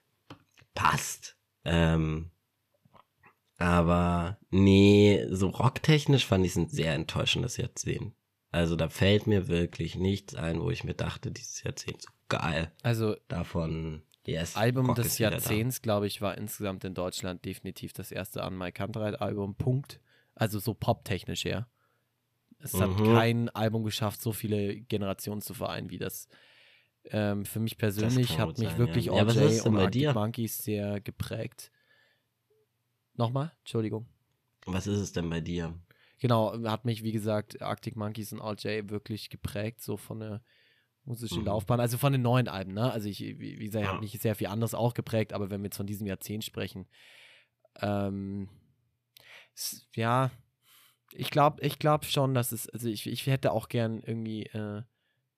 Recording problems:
none

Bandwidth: 14.5 kHz